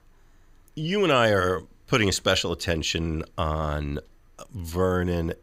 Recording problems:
none

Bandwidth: 15.5 kHz